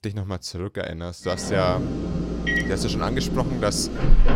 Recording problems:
household noises; very loud; from 1.5 s on; 1 dB above the speech

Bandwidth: 16 kHz